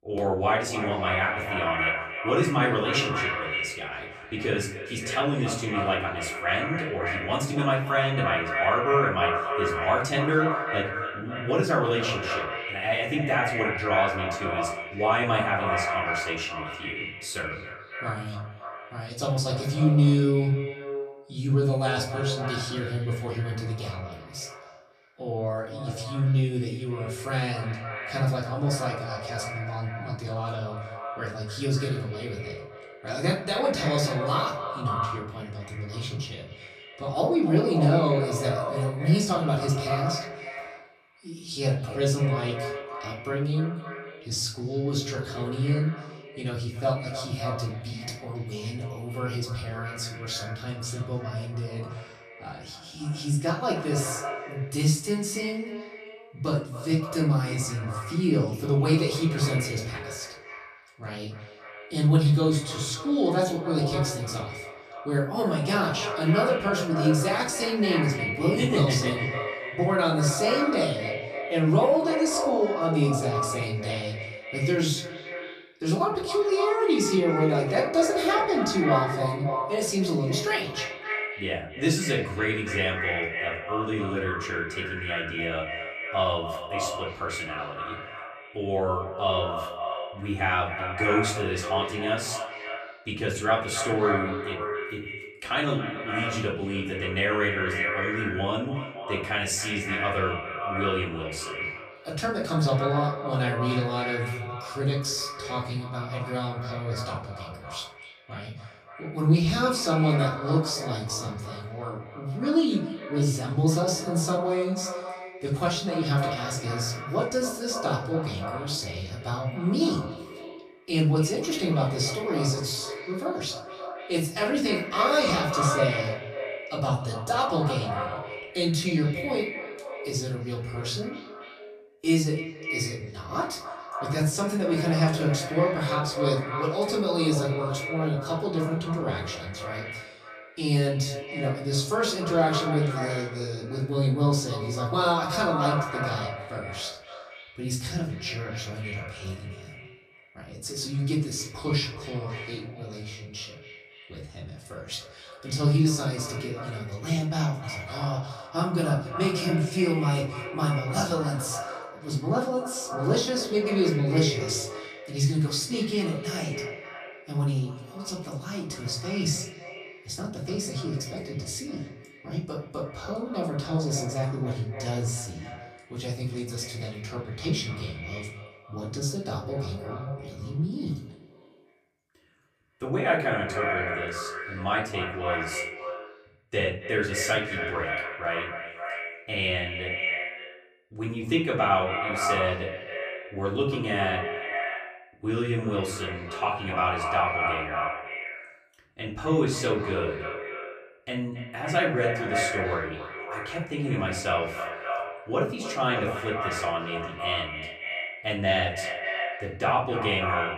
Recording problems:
echo of what is said; strong; throughout; 270 ms later, 6 dB below the speech
off-mic speech; far
room echo; slight; dies away in 0.4 s

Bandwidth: 14.5 kHz